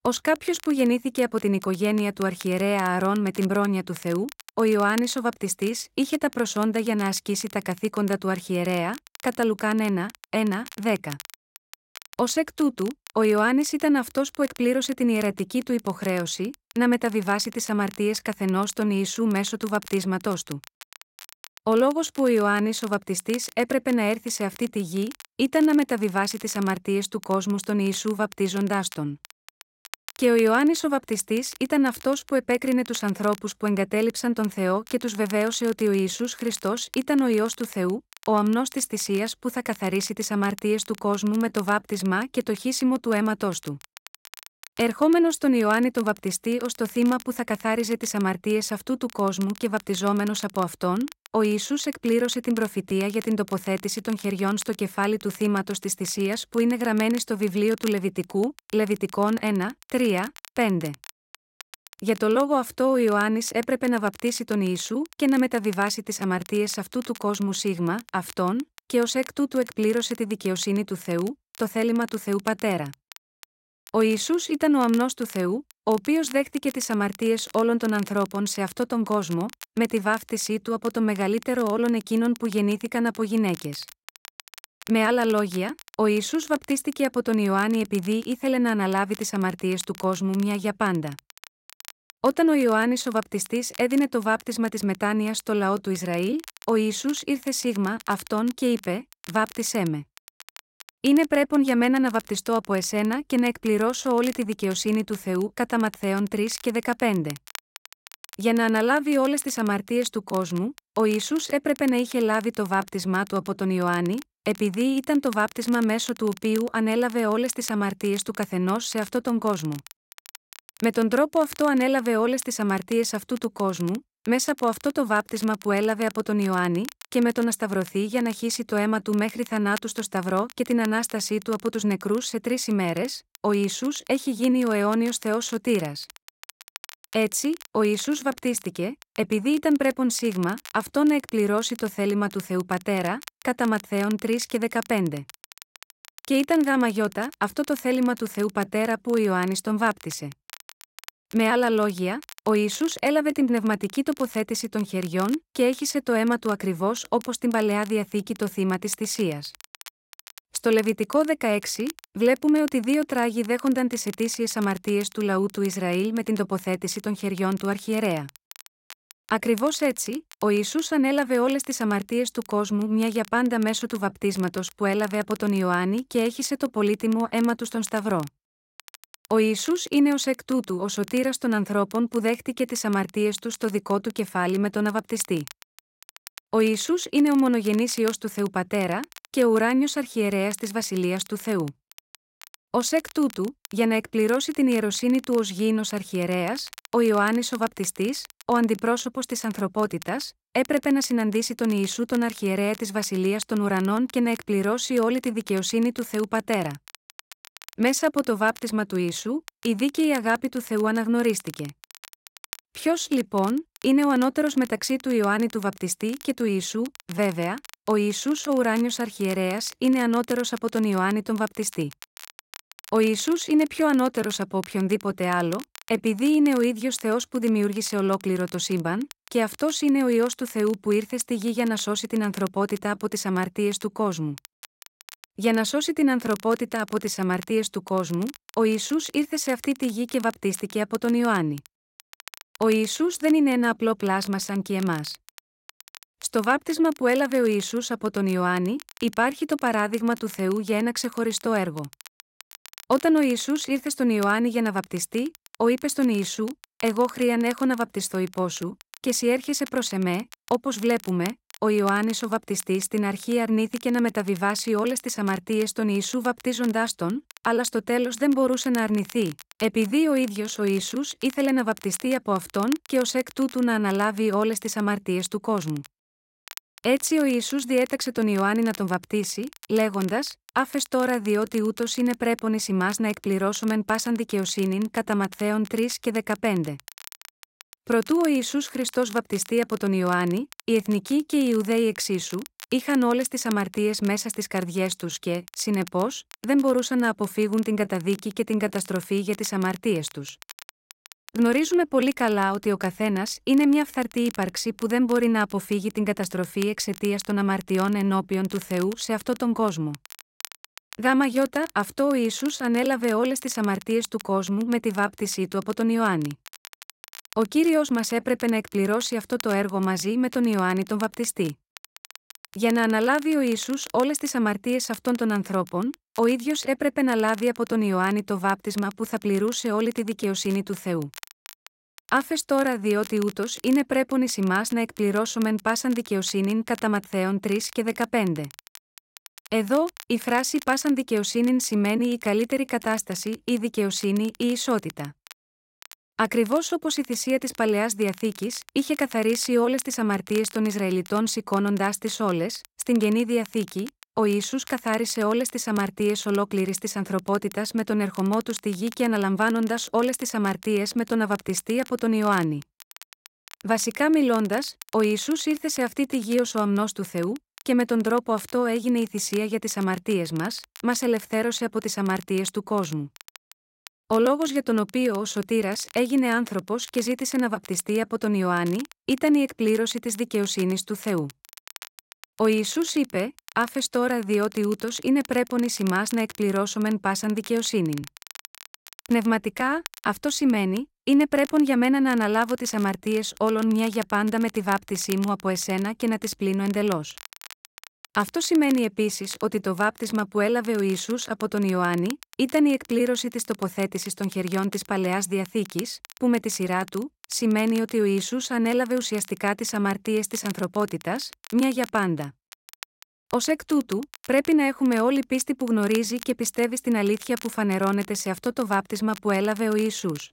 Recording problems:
crackle, like an old record; faint; 20 dB below the speech

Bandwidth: 16 kHz